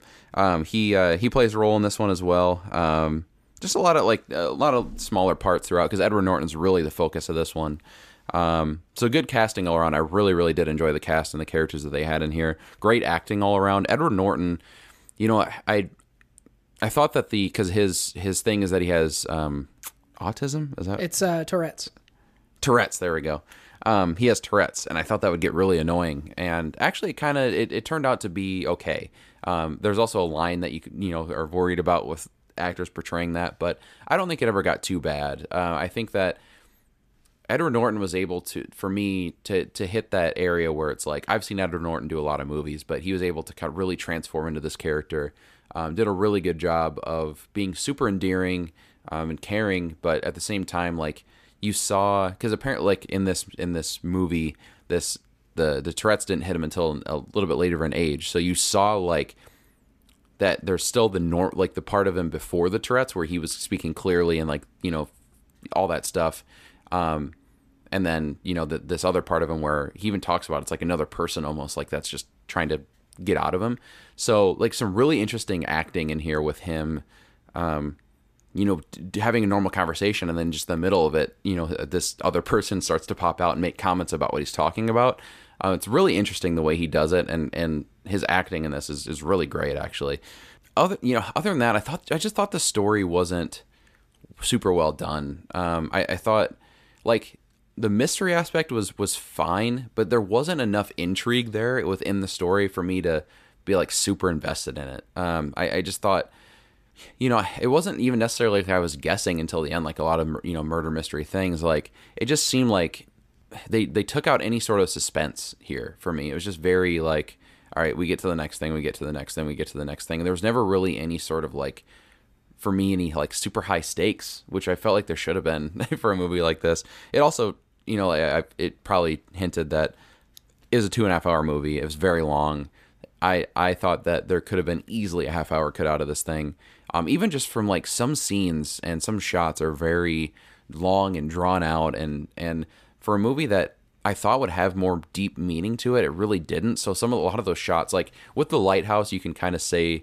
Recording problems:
none

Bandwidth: 14.5 kHz